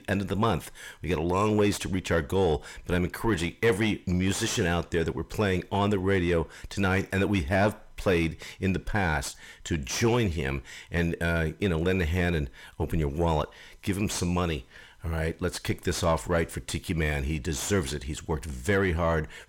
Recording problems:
distortion; slight; 10 dB below the speech

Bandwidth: 16.5 kHz